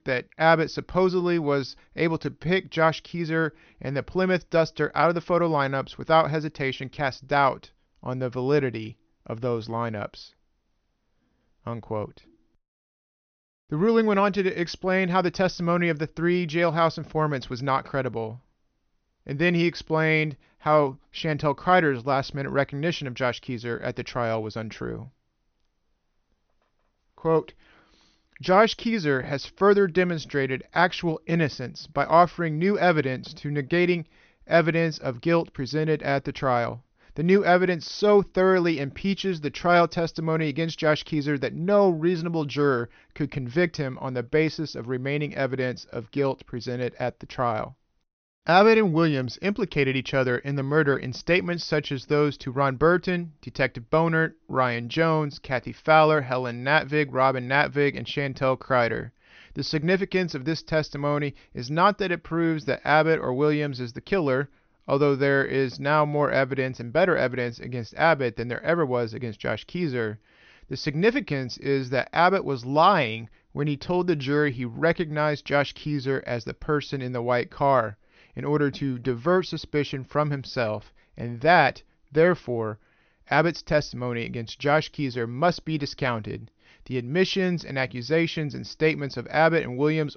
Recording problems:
high frequencies cut off; noticeable; nothing above 6.5 kHz

